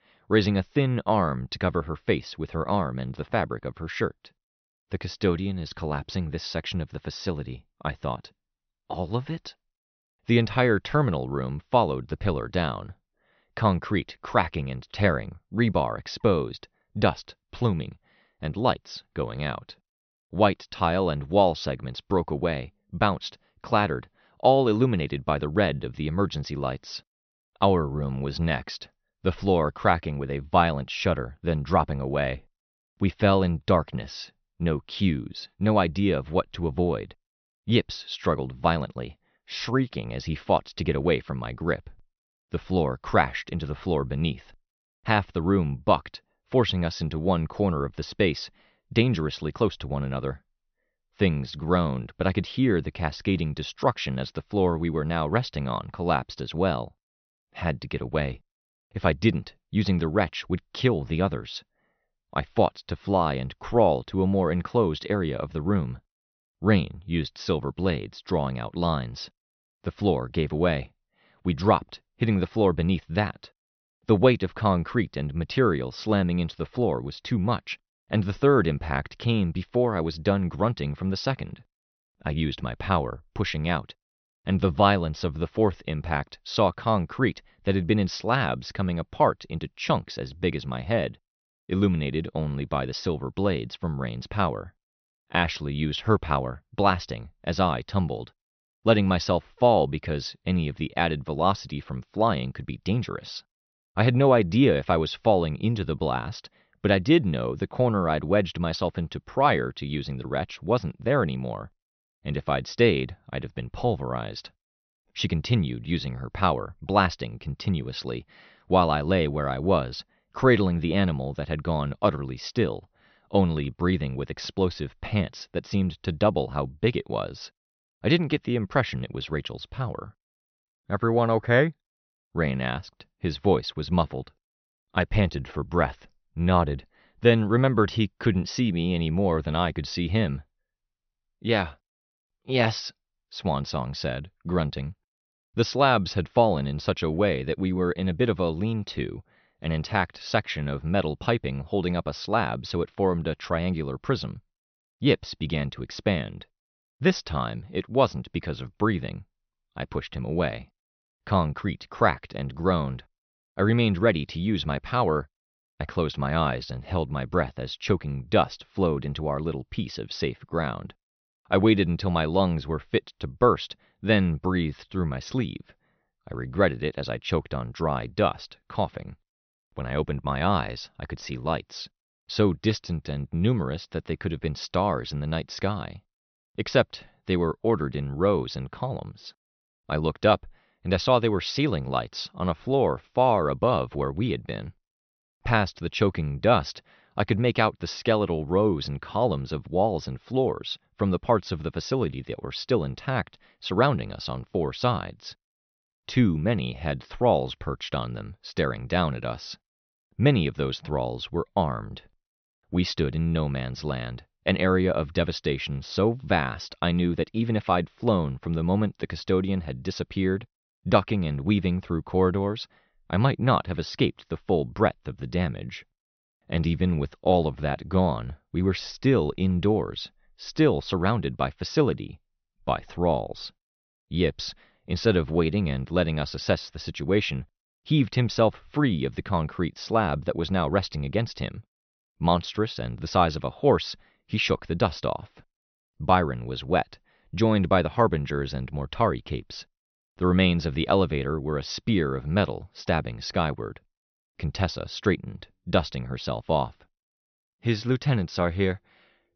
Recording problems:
high frequencies cut off; noticeable; nothing above 6 kHz

